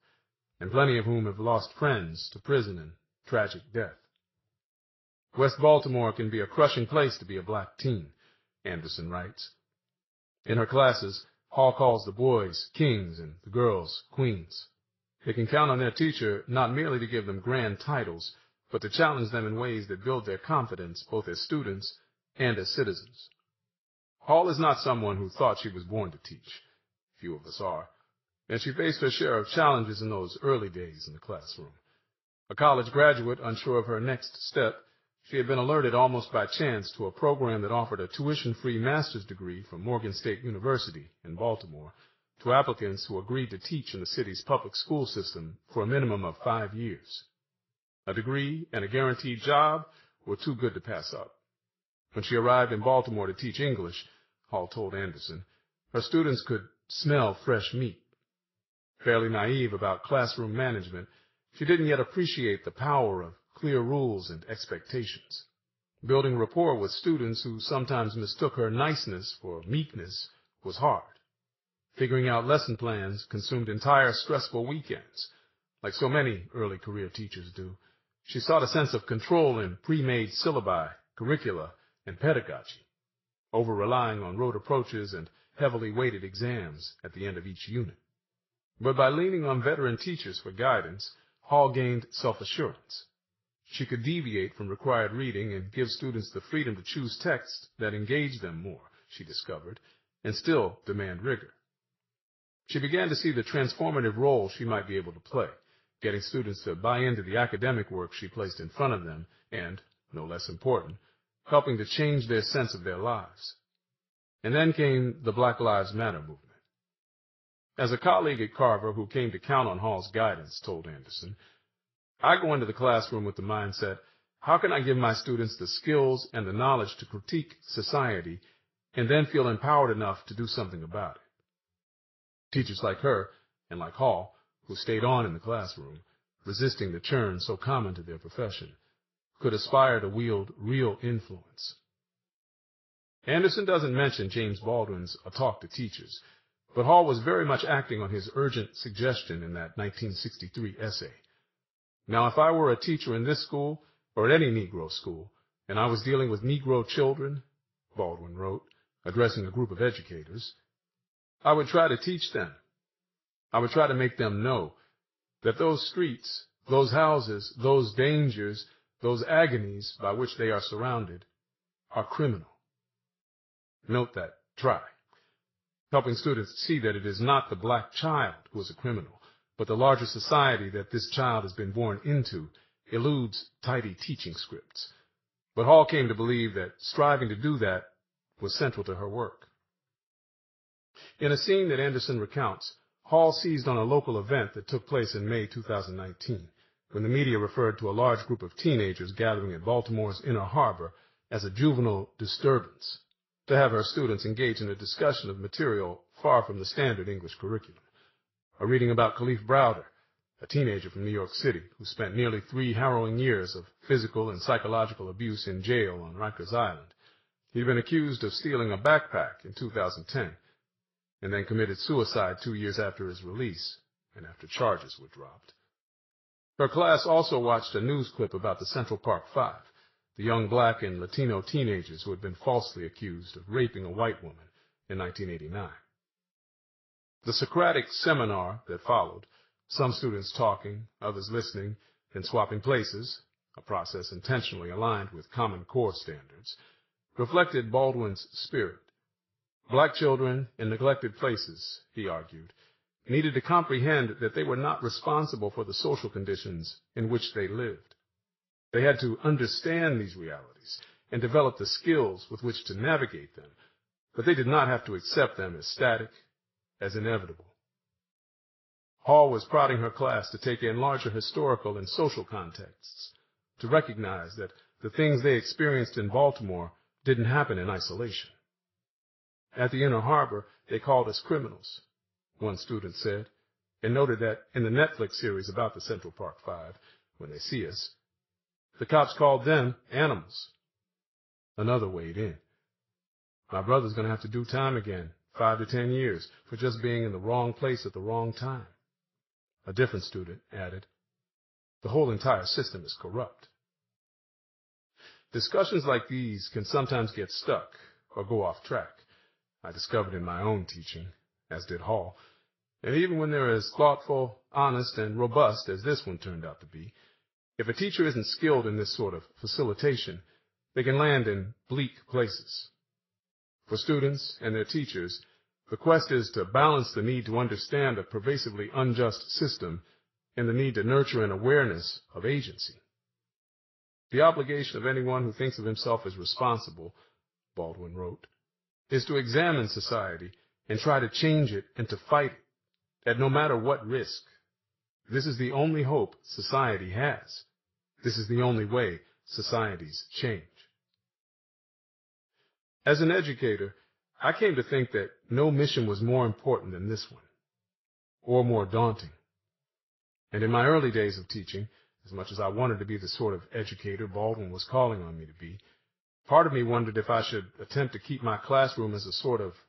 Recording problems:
echo of what is said; faint; throughout; 90 ms later, 25 dB below the speech
garbled, watery; slightly; nothing above 5.5 kHz

